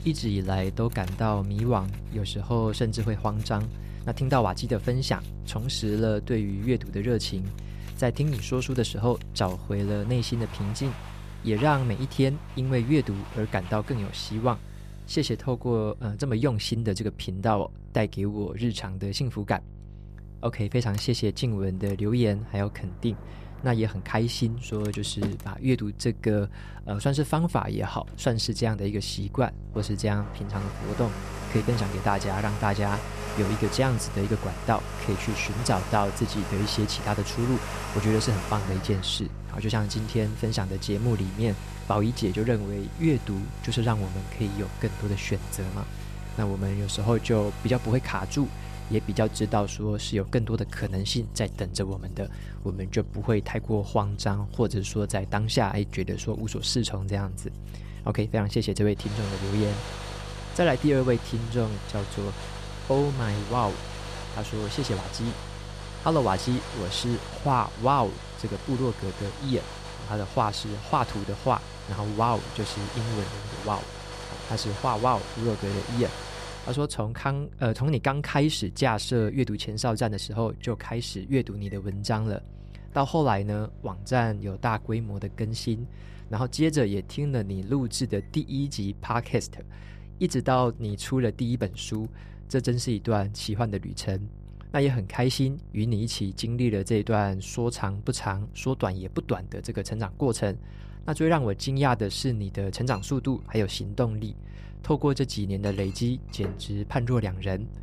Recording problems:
household noises; noticeable; throughout; 15 dB below the speech
electrical hum; faint; throughout; 50 Hz, 25 dB below the speech

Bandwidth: 14.5 kHz